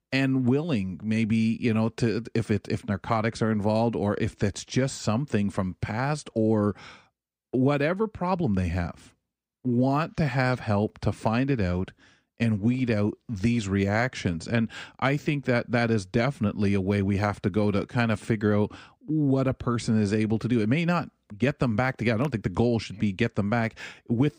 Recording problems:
none

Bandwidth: 15.5 kHz